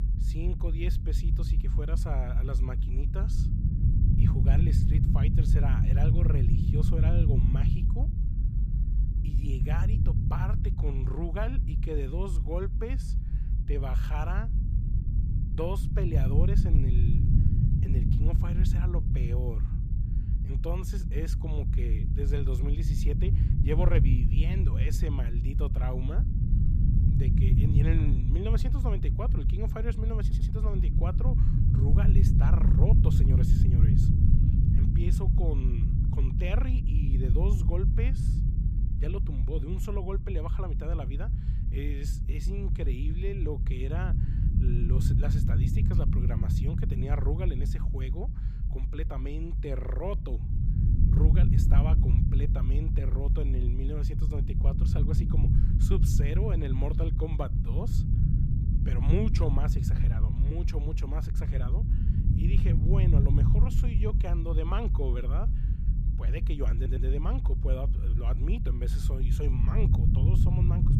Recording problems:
low rumble; loud; throughout; 1 dB below the speech
audio stuttering; at 30 s and at 1:07

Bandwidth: 15 kHz